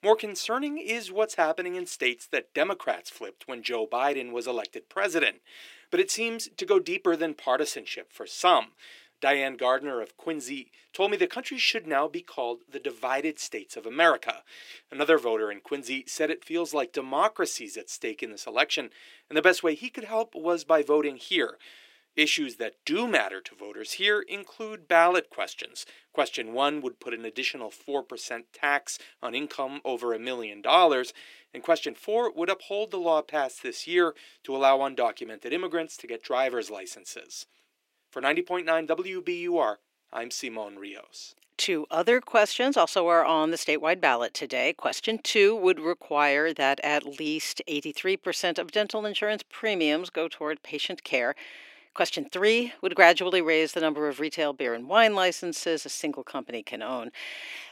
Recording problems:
thin; somewhat; fading below 300 Hz

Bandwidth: 16 kHz